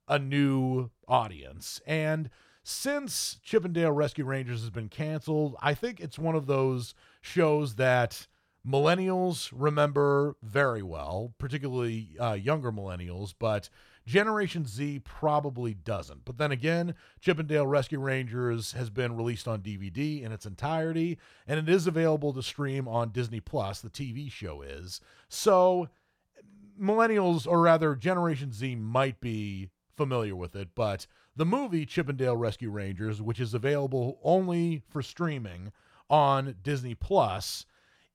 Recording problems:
none

